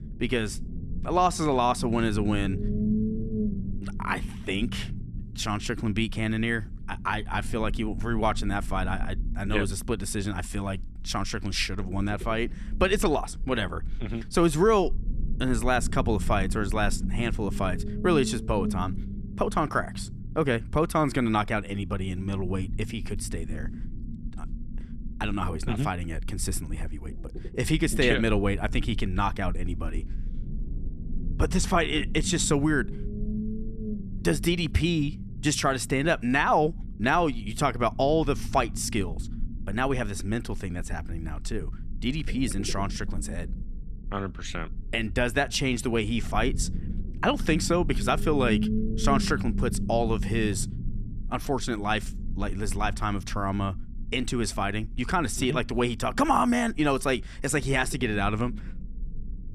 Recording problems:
low rumble; noticeable; throughout; 15 dB below the speech

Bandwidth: 13.5 kHz